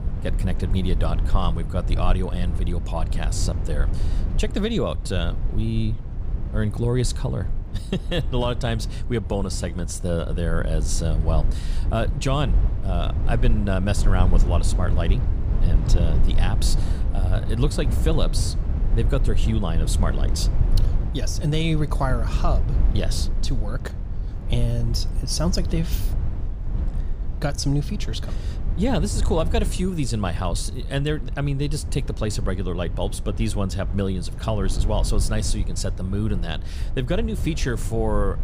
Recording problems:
low rumble; noticeable; throughout; 10 dB below the speech

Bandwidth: 15 kHz